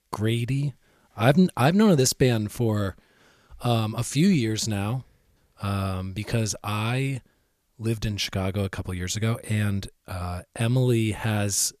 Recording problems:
none

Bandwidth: 14.5 kHz